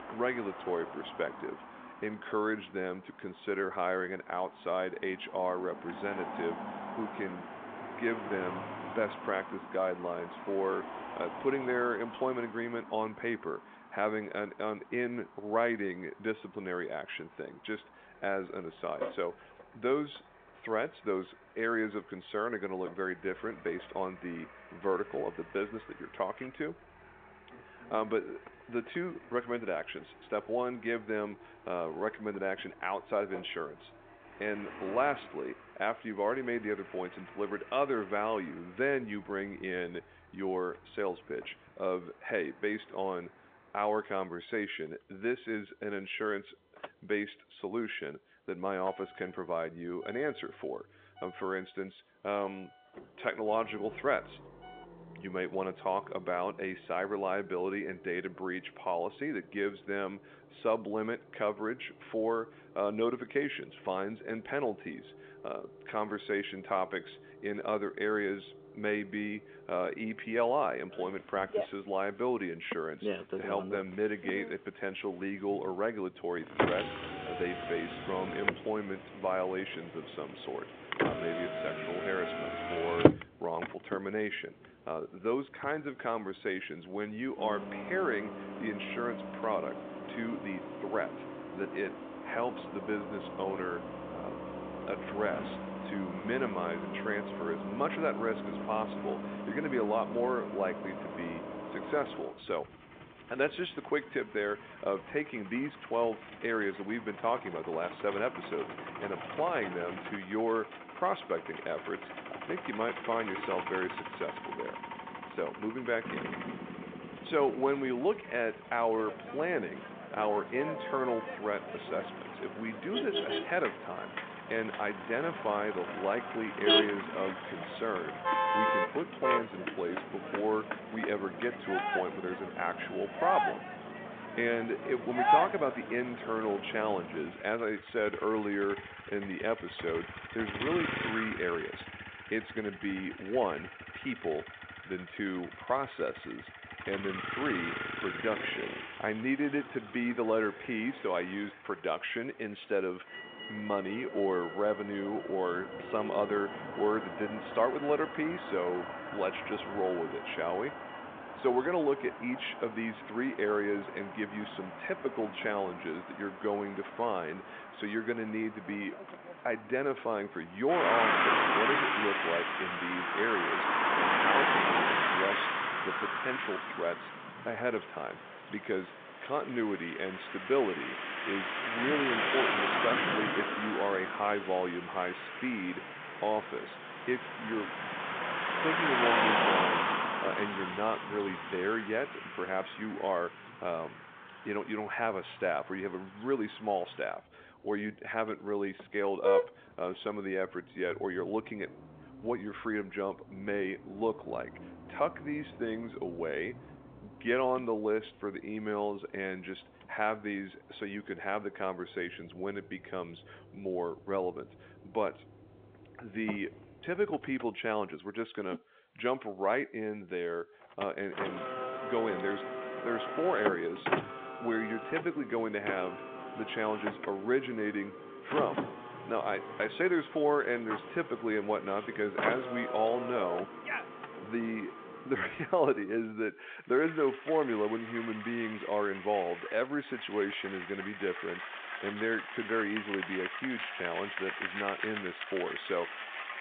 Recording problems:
phone-call audio; nothing above 3.5 kHz
traffic noise; loud; throughout; 2 dB below the speech

